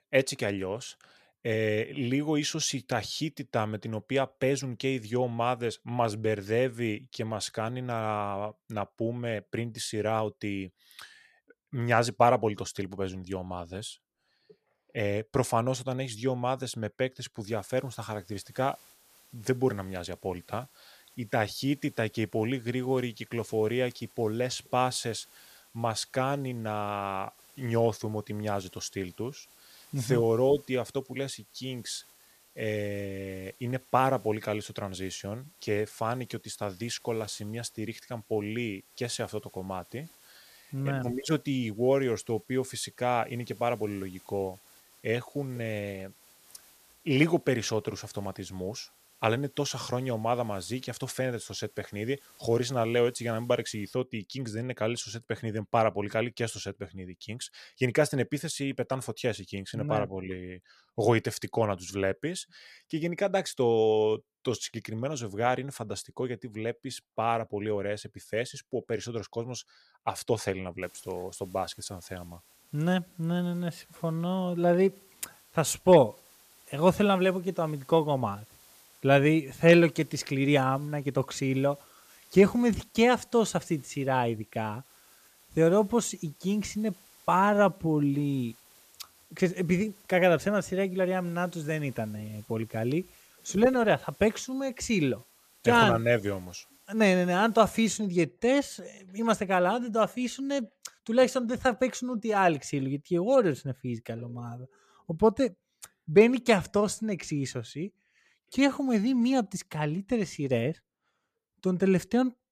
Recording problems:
hiss; faint; from 17 to 54 s and from 1:11 to 1:38; 25 dB below the speech

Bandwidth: 14.5 kHz